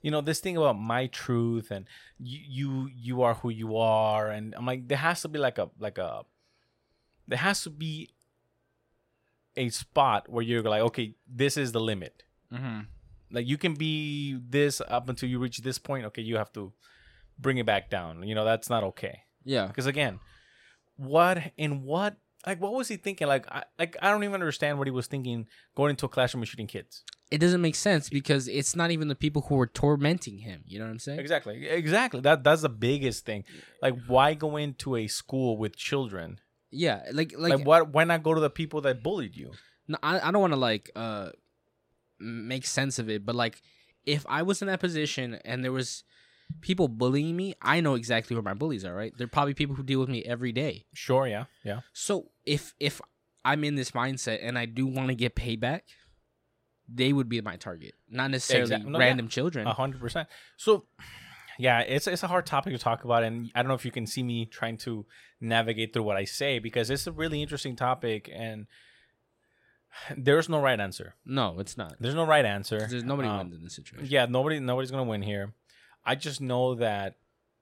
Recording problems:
none

